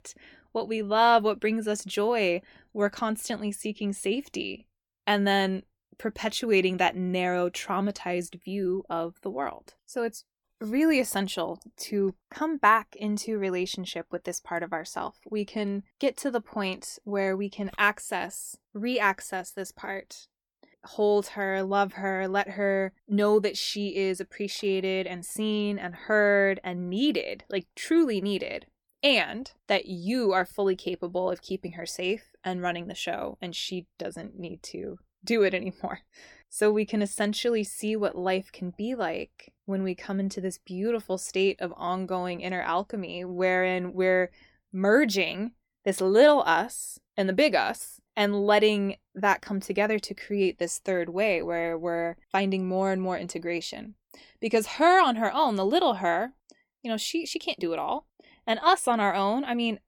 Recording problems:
none

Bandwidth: 18 kHz